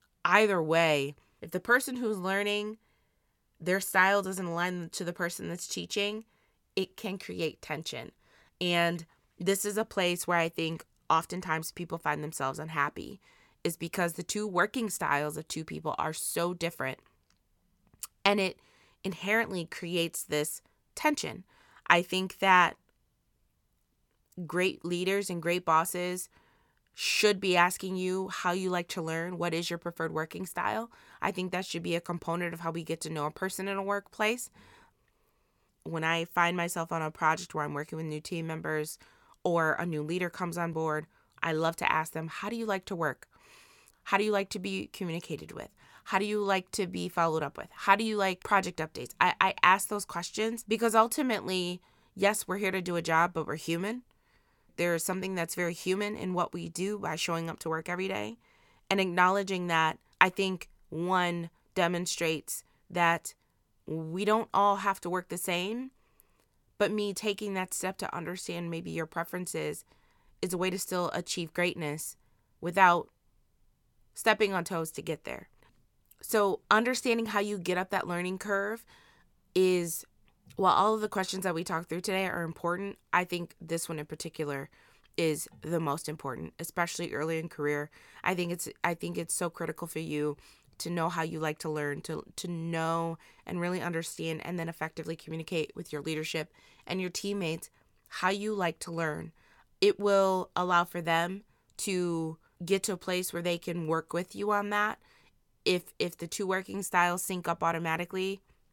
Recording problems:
none

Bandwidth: 17.5 kHz